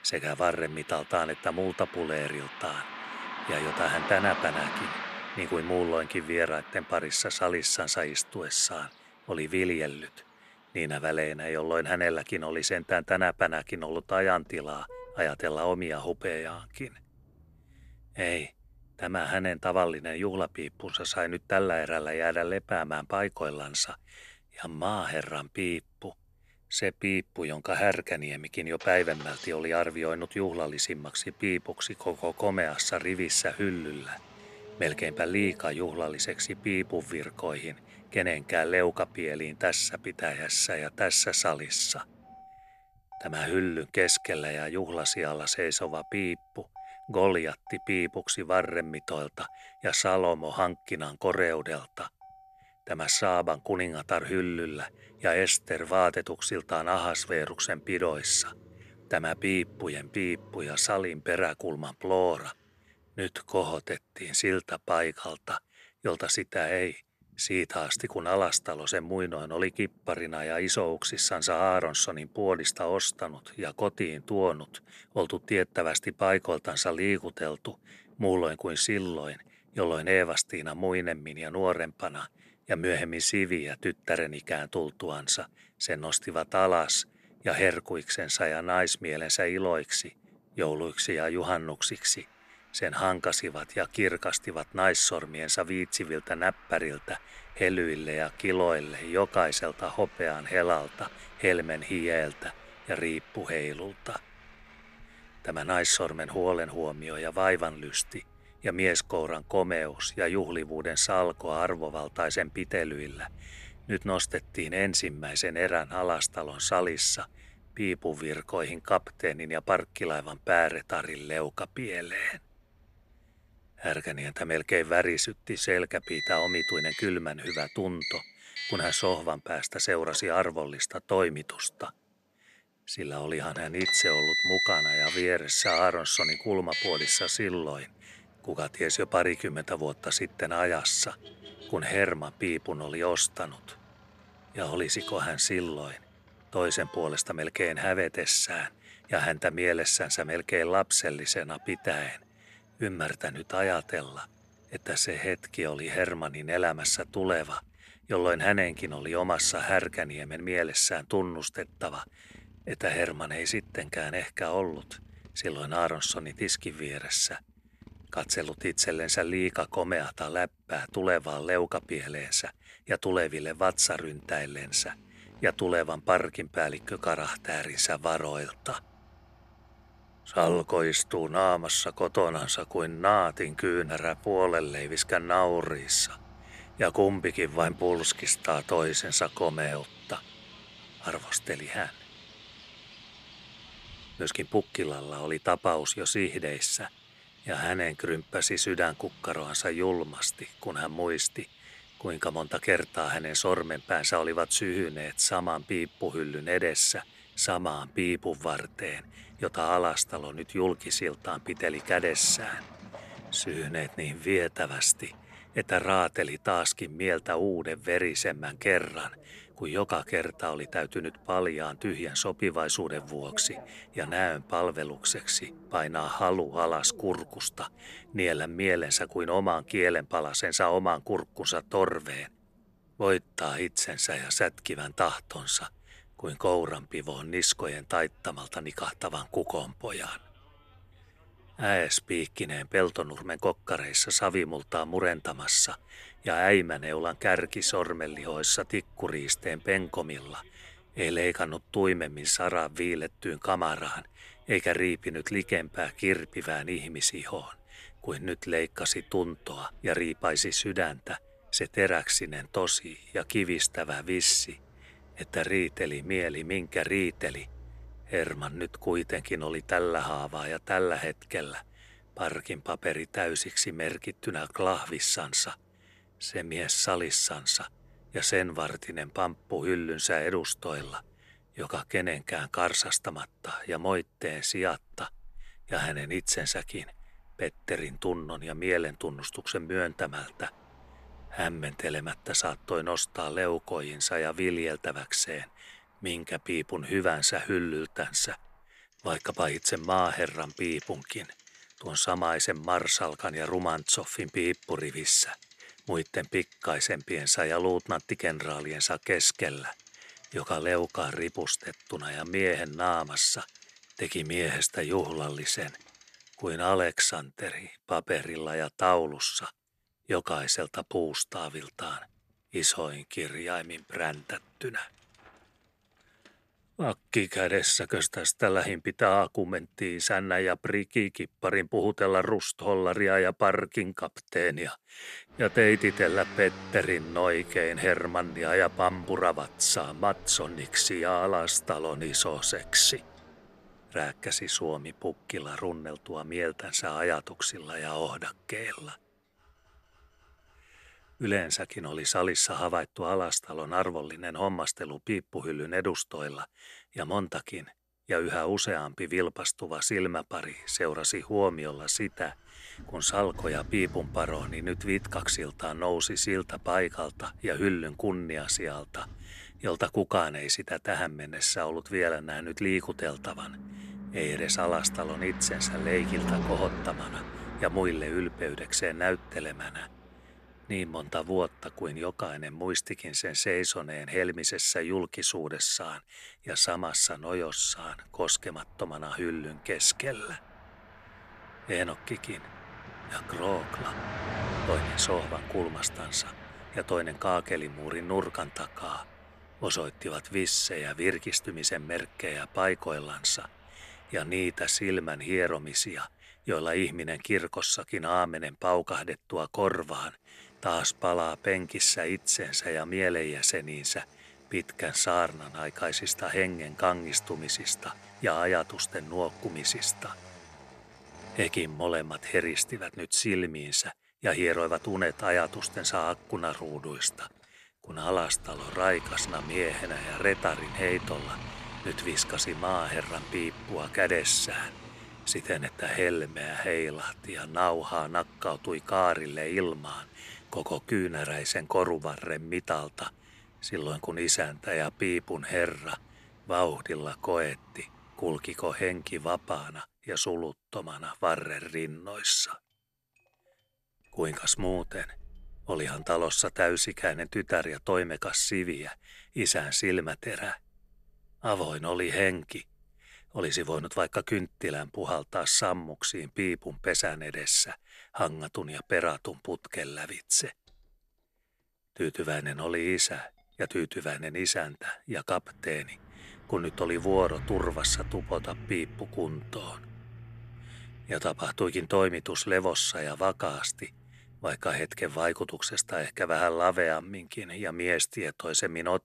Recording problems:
traffic noise; noticeable; throughout; 10 dB below the speech

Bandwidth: 13.5 kHz